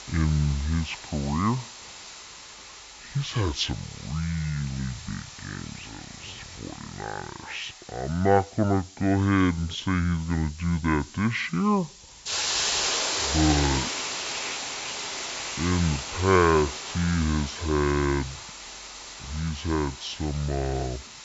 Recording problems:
wrong speed and pitch; too slow and too low; 0.6 times normal speed
high frequencies cut off; slight; nothing above 8 kHz
hiss; loud; throughout; 6 dB below the speech

